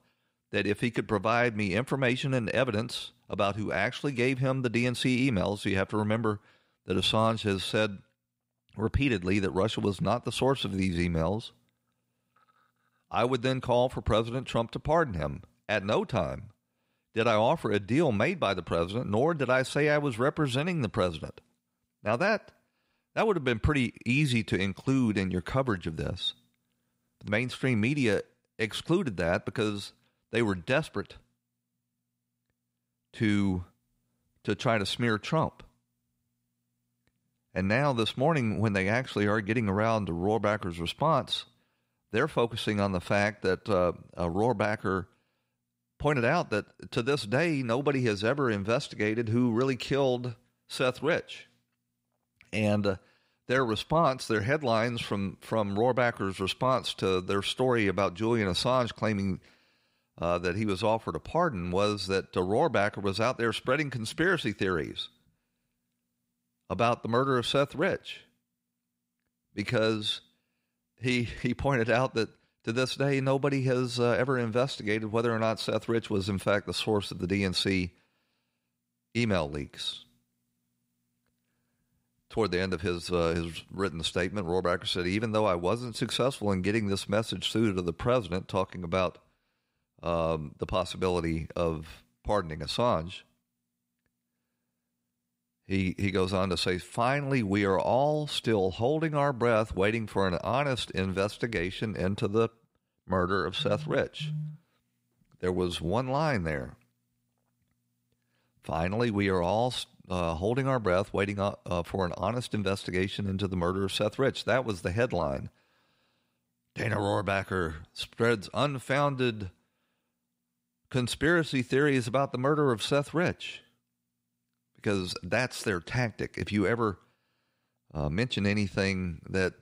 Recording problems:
none

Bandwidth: 15.5 kHz